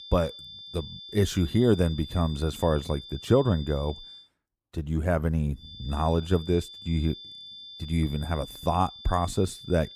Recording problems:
high-pitched whine; noticeable; until 4 s and from 5.5 s on; 3.5 kHz, 15 dB below the speech

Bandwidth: 15 kHz